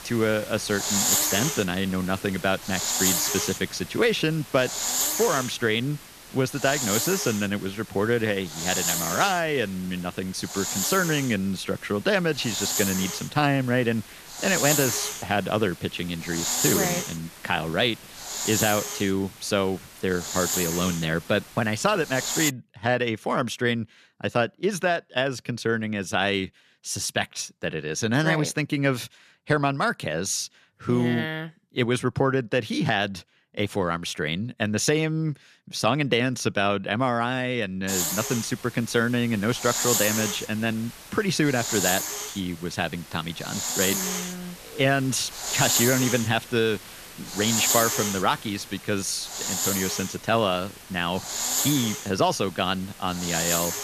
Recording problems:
hiss; loud; until 22 s and from 38 s on; 1 dB below the speech

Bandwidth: 14.5 kHz